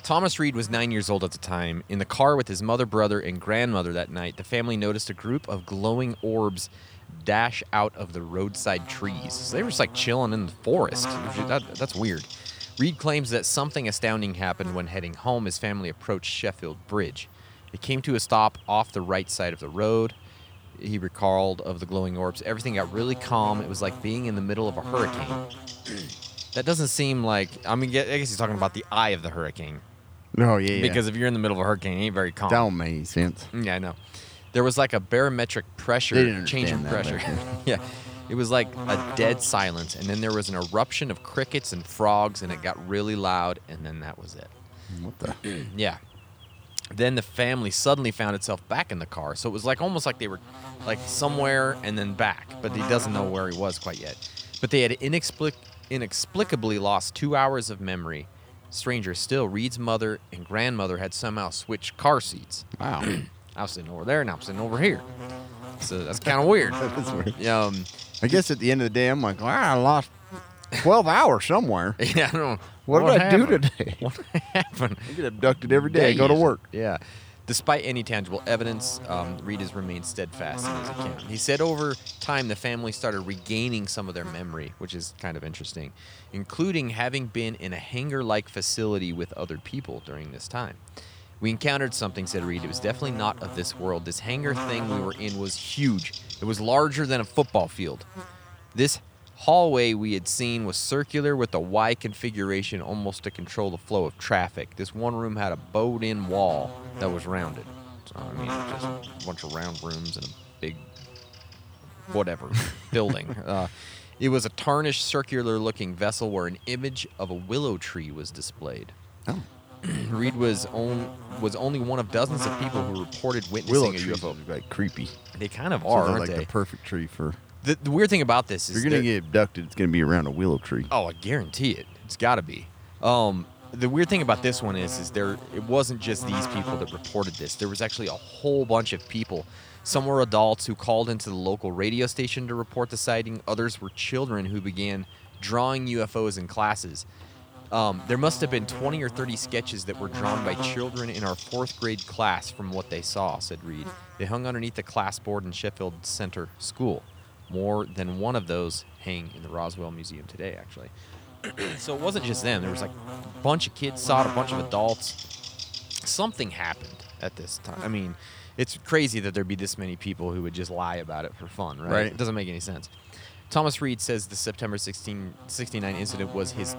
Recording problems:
electrical hum; noticeable; throughout; 50 Hz, 15 dB below the speech

